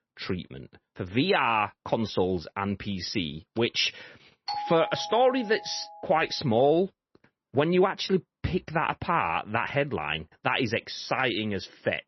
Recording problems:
garbled, watery; slightly; nothing above 6 kHz
doorbell; noticeable; from 4.5 to 6 s; peak 6 dB below the speech

